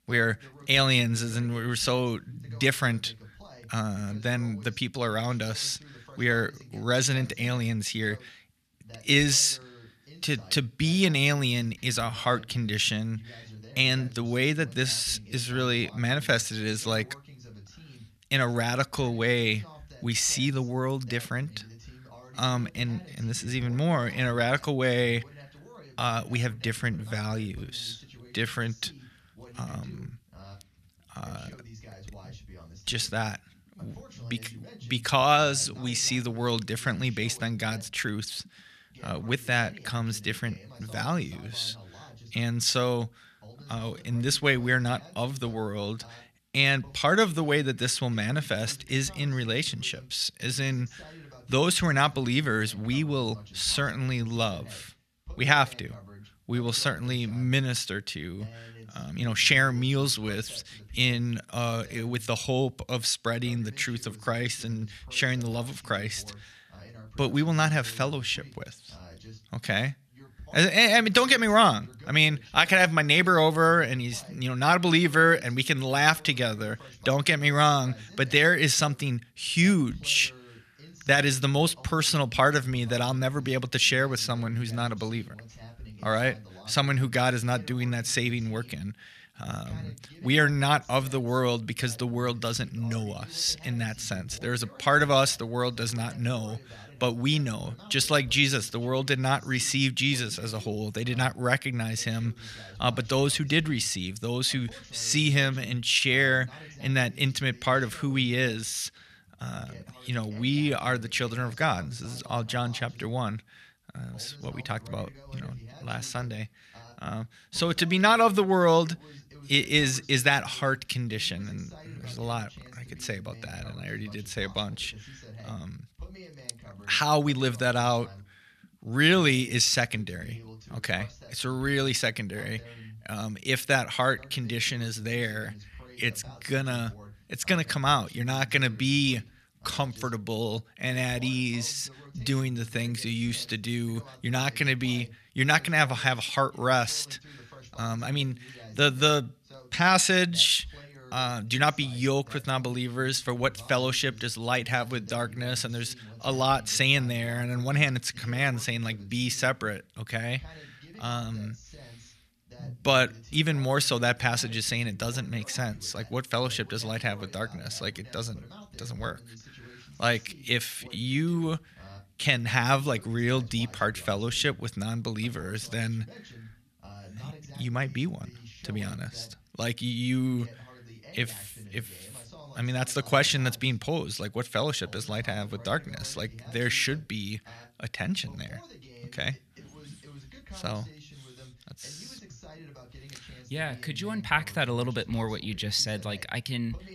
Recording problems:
voice in the background; faint; throughout; 20 dB below the speech

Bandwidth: 14.5 kHz